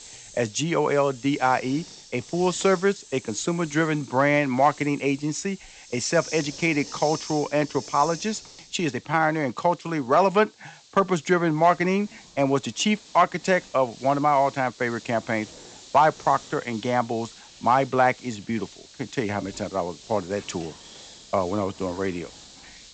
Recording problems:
high frequencies cut off; noticeable; nothing above 8 kHz
hiss; noticeable; throughout; 20 dB below the speech

